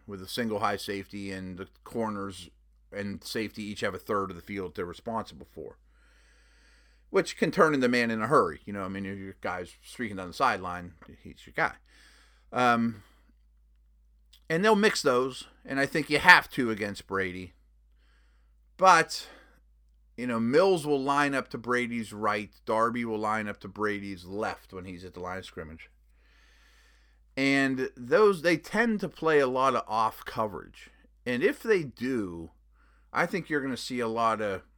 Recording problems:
none

